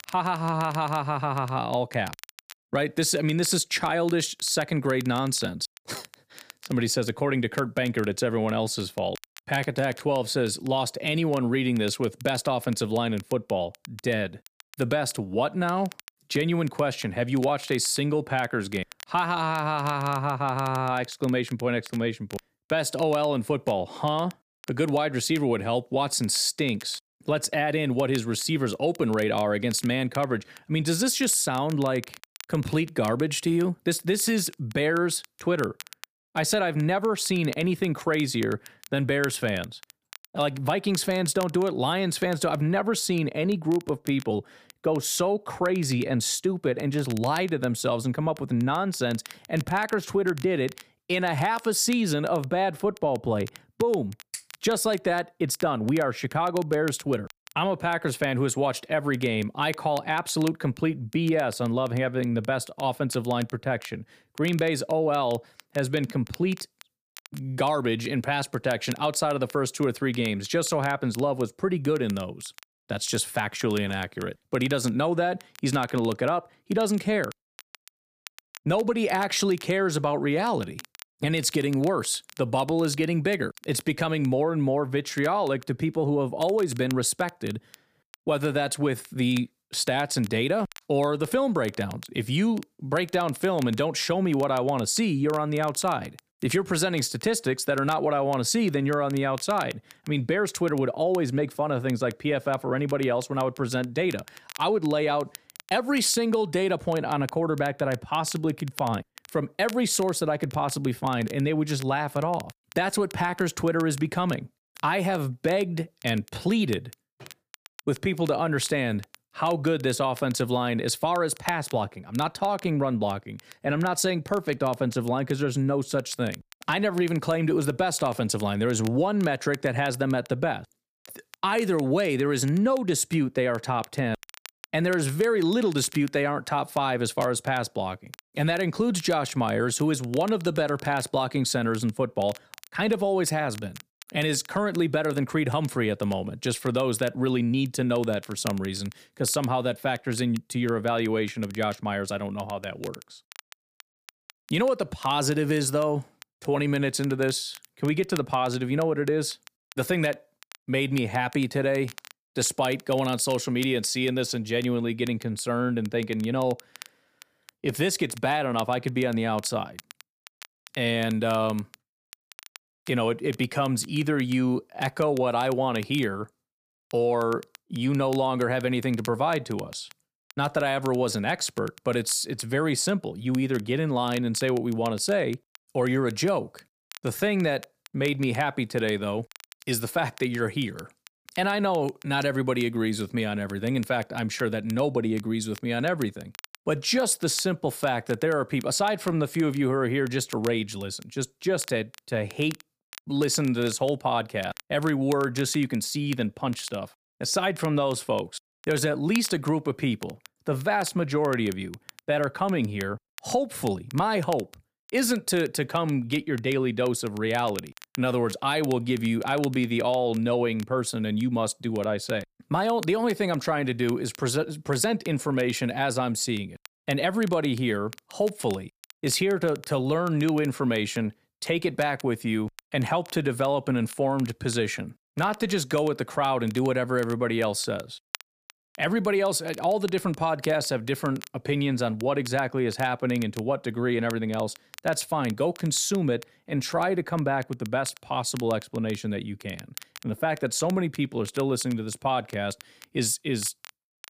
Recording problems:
crackle, like an old record; faint; 20 dB below the speech

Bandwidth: 15 kHz